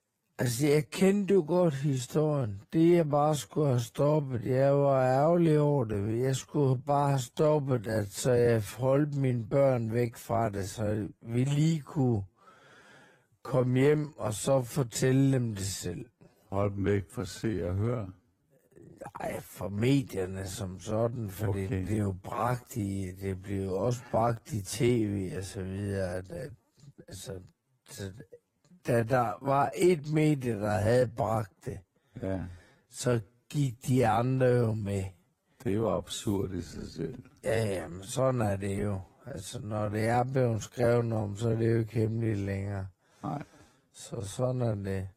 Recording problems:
wrong speed, natural pitch; too slow; 0.5 times normal speed
garbled, watery; slightly; nothing above 14.5 kHz

